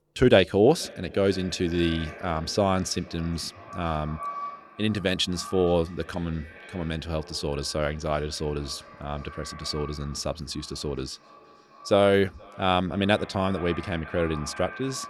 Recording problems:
echo of what is said; noticeable; throughout; 470 ms later, 15 dB below the speech

